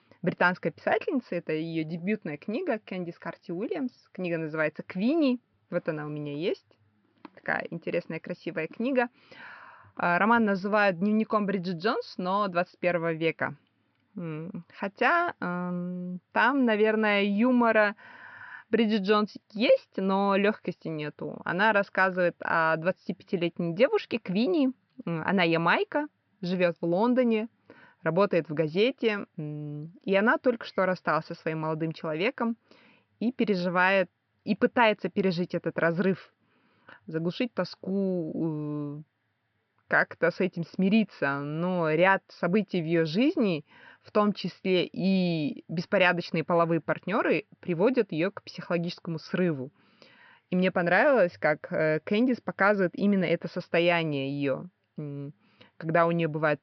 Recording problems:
high frequencies cut off; noticeable; nothing above 5.5 kHz
muffled; very slightly; fading above 4 kHz

